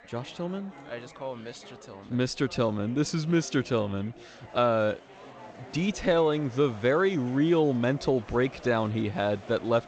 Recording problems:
garbled, watery; slightly; nothing above 7.5 kHz
chatter from many people; faint; throughout; 20 dB below the speech

